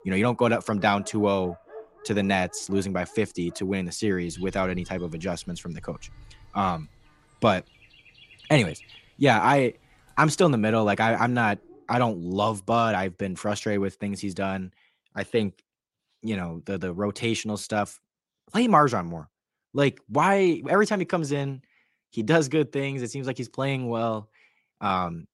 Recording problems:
animal sounds; faint; until 12 s; 25 dB below the speech

